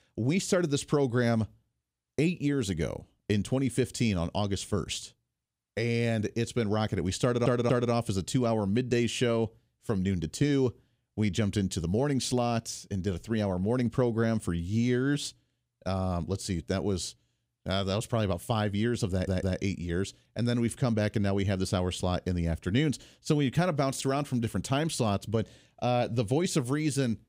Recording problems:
audio stuttering; at 7 s and at 19 s

